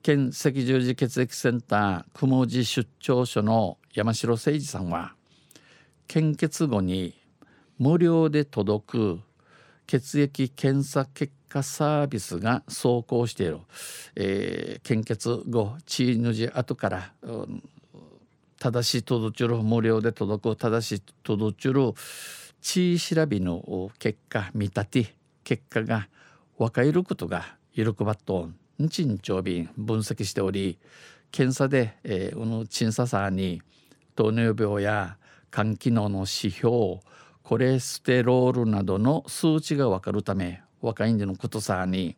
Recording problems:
none

